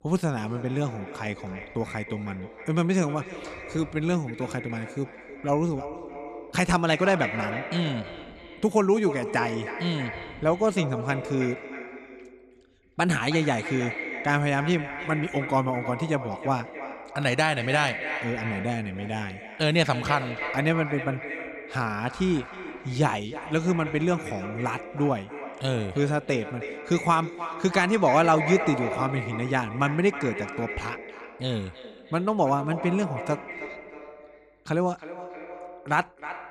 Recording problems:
echo of what is said; strong; throughout; 320 ms later, 9 dB below the speech

